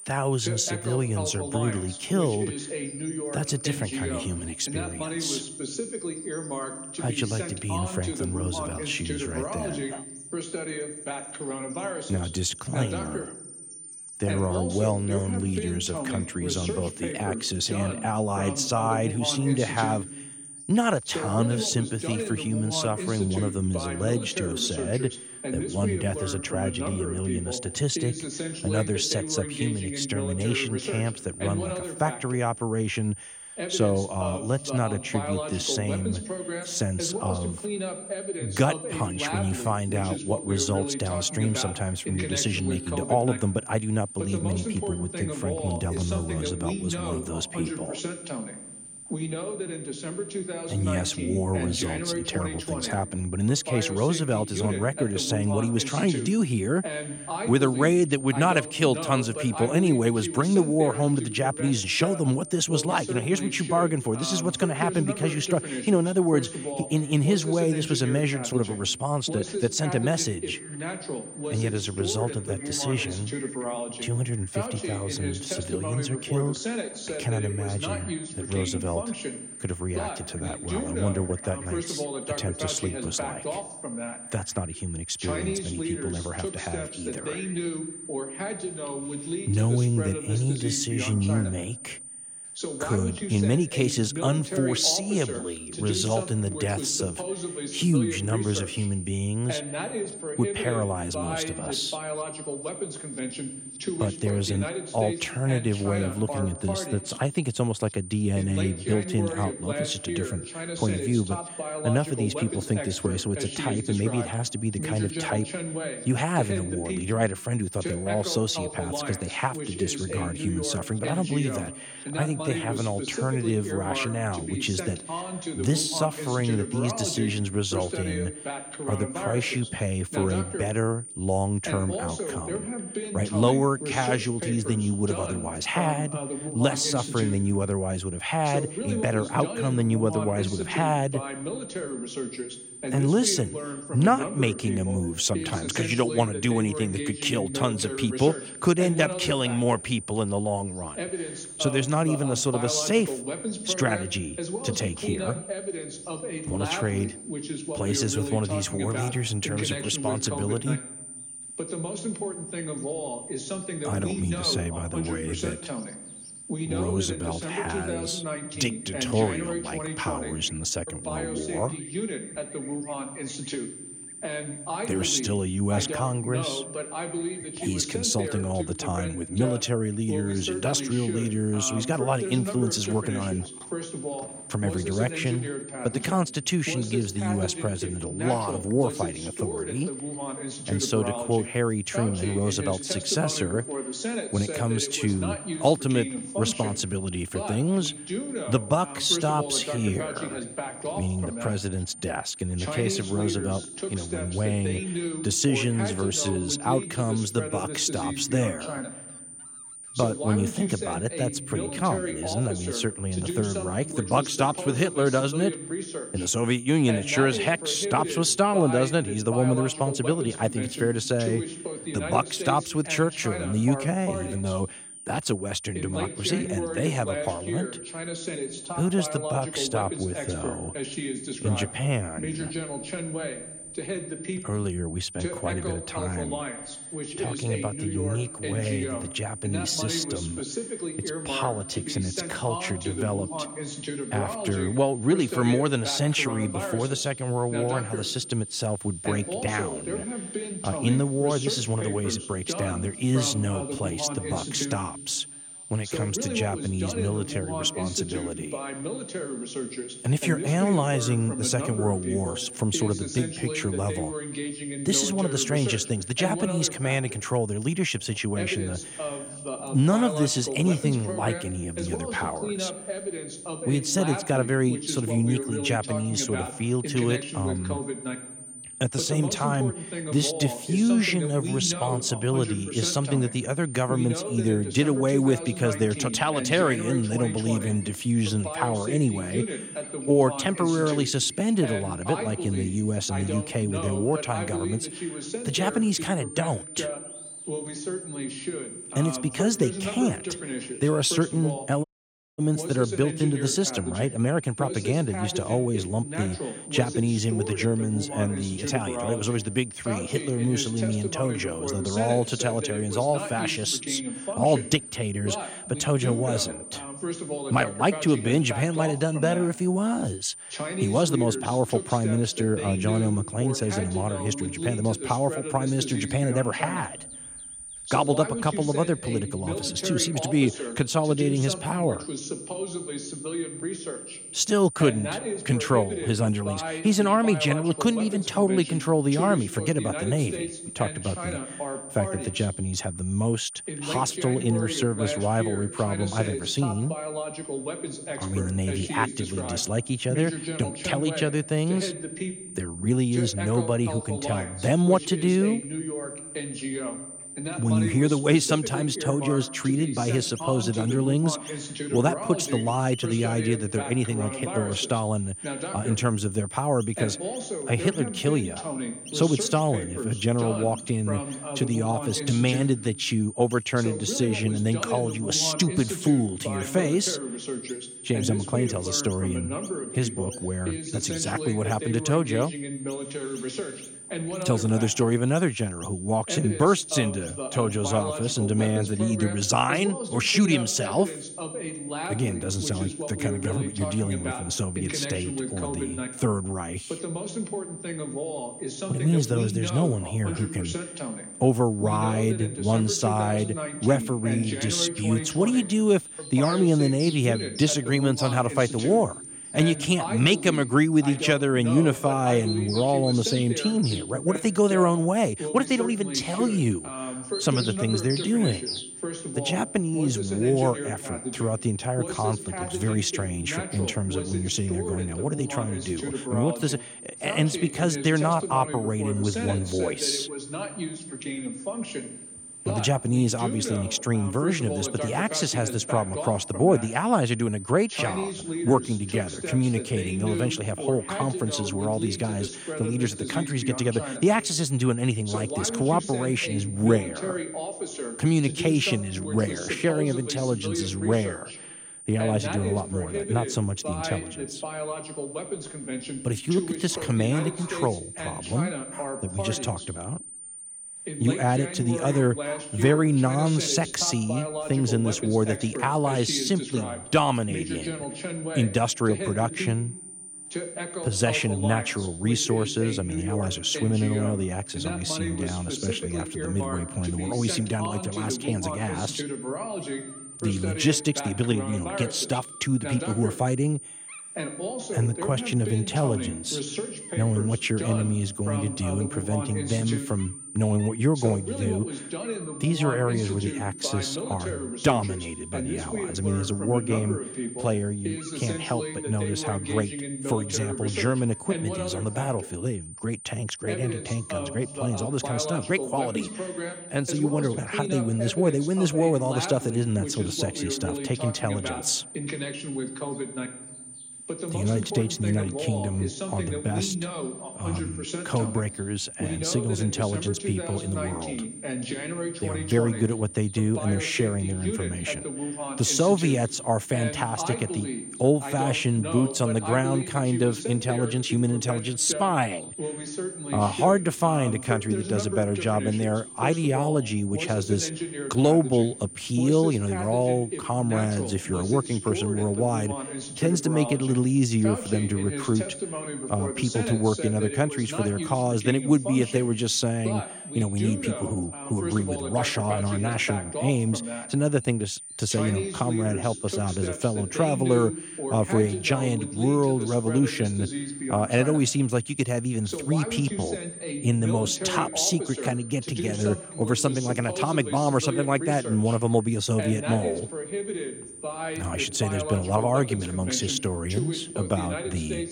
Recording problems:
voice in the background; loud; throughout; 8 dB below the speech
high-pitched whine; noticeable; throughout; 9 kHz, 10 dB below the speech
animal sounds; faint; throughout; 25 dB below the speech
audio cutting out; at 5:02 for 0.5 s

